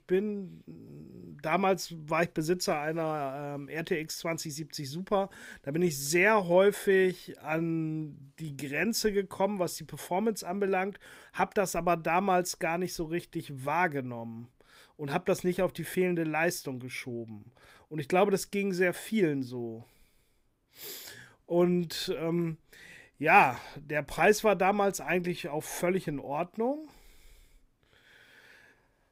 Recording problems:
none

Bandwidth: 15.5 kHz